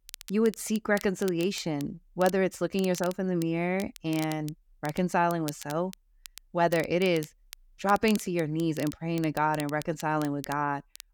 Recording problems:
crackle, like an old record; noticeable; 15 dB below the speech

